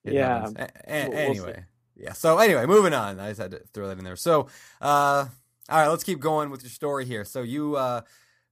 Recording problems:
none

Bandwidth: 15 kHz